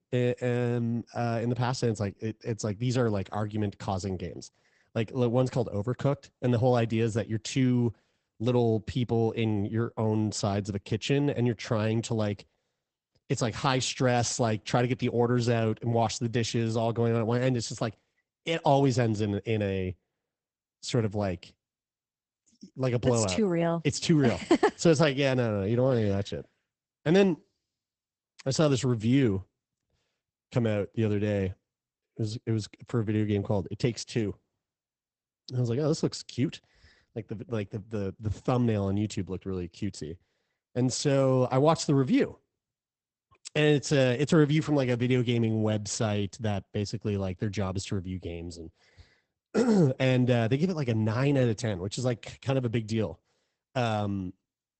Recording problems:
garbled, watery; badly; nothing above 8 kHz

